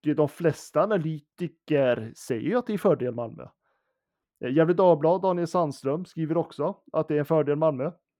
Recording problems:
muffled; very; fading above 2.5 kHz

